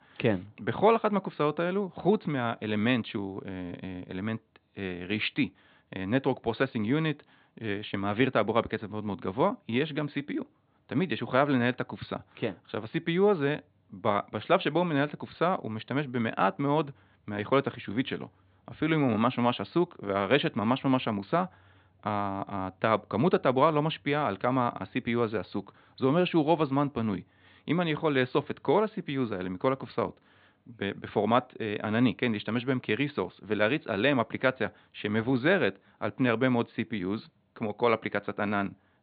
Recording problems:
high frequencies cut off; severe; nothing above 4 kHz

